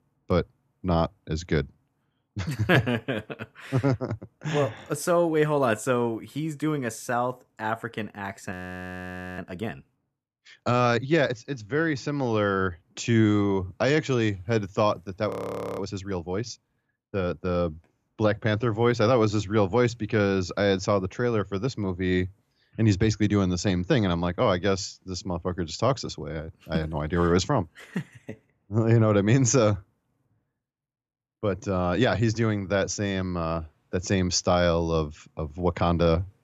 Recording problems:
audio freezing; at 8.5 s for 1 s and at 15 s for 0.5 s

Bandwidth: 14 kHz